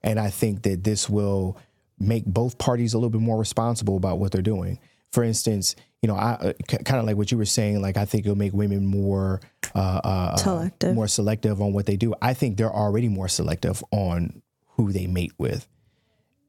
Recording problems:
squashed, flat; somewhat

